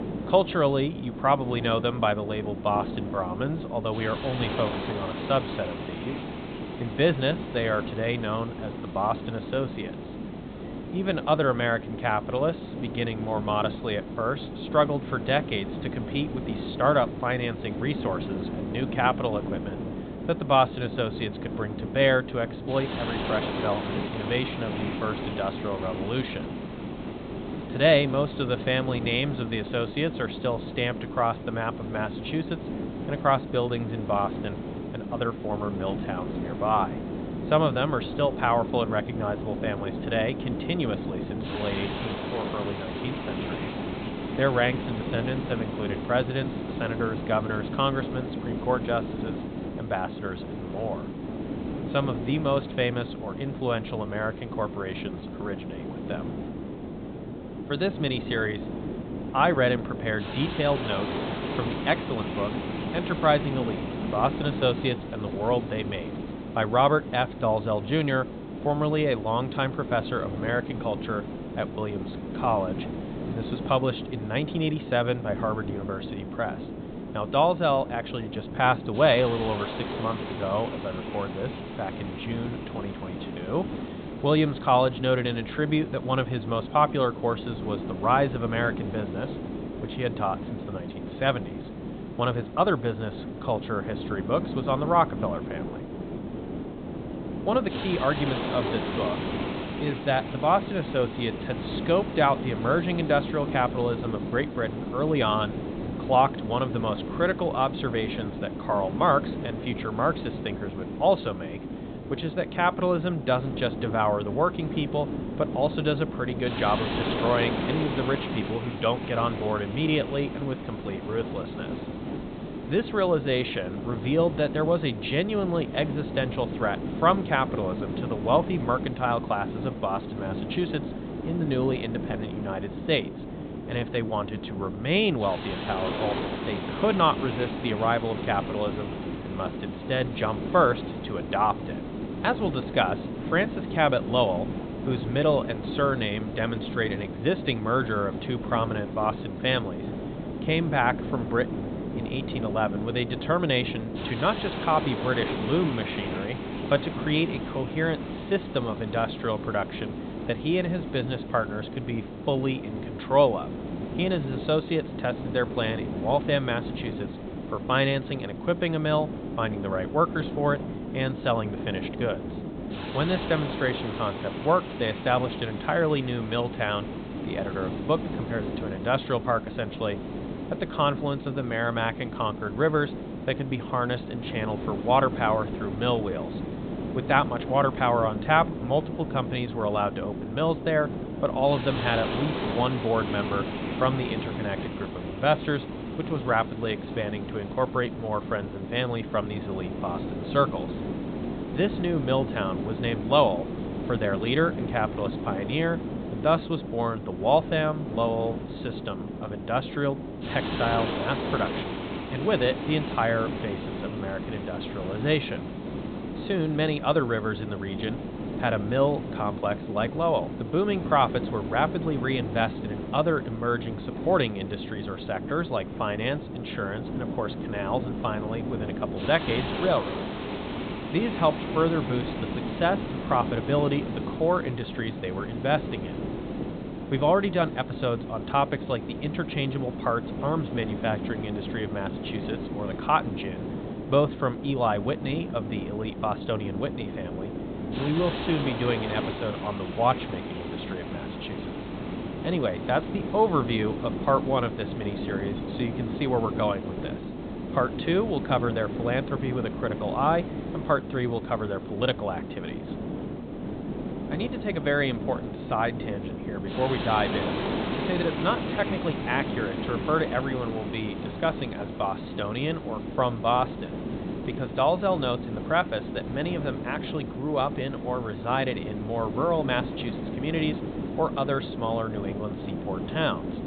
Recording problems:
high frequencies cut off; severe; nothing above 4 kHz
hiss; loud; throughout; 6 dB below the speech

